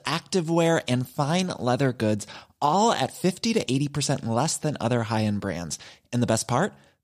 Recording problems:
none

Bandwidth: 15 kHz